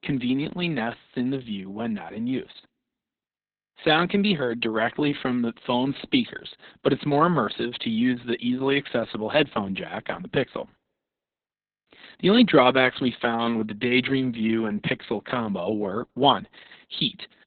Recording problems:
garbled, watery; badly; nothing above 4 kHz

